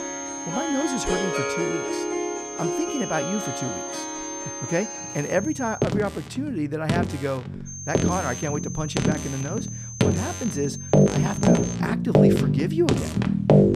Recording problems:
background music; very loud; throughout; 4 dB above the speech
high-pitched whine; loud; until 6 s and from 7.5 to 12 s; 6.5 kHz, 6 dB below the speech

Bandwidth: 14.5 kHz